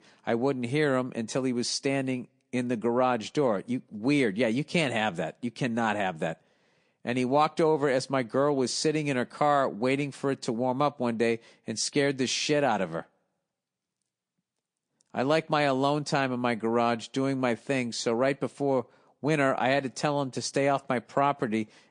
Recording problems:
garbled, watery; slightly; nothing above 9.5 kHz

